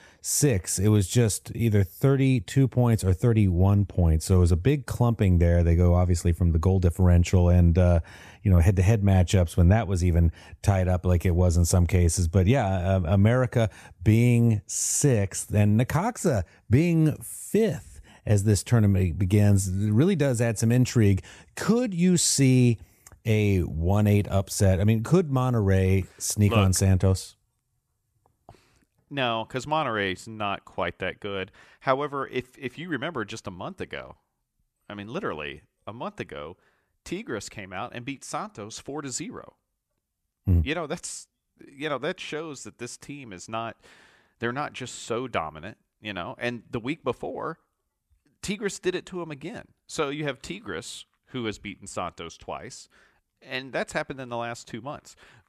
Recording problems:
none

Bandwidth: 14.5 kHz